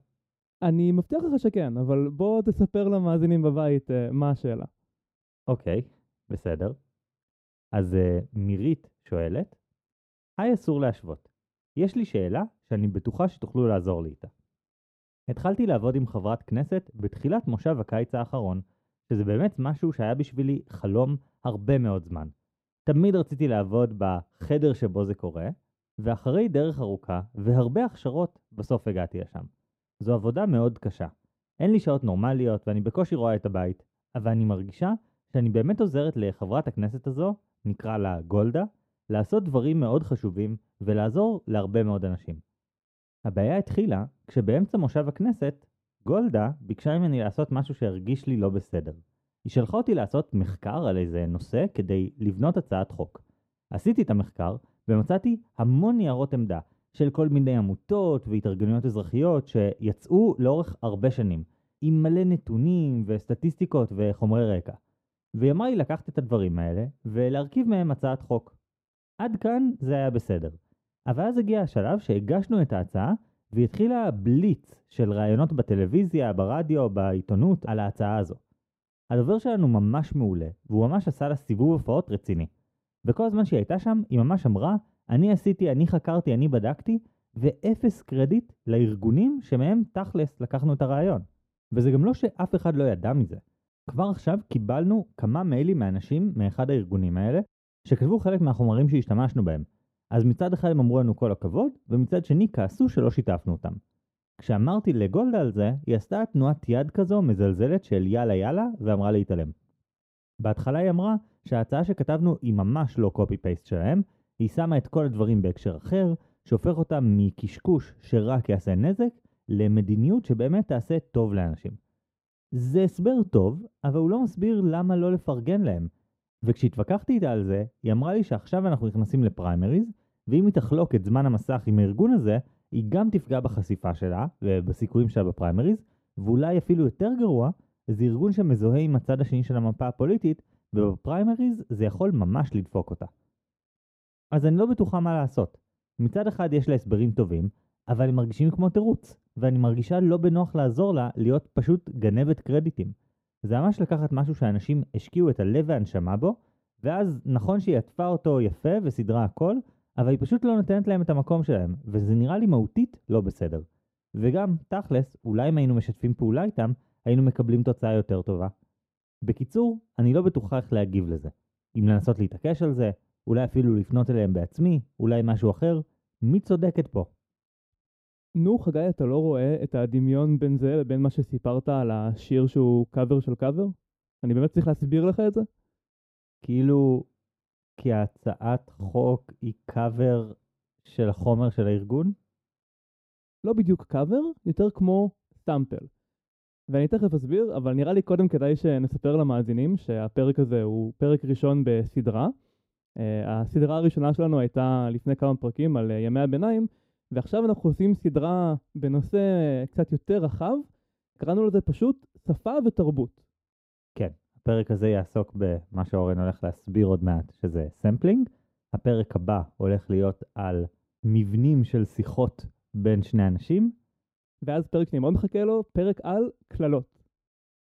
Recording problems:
muffled; very; fading above 1 kHz

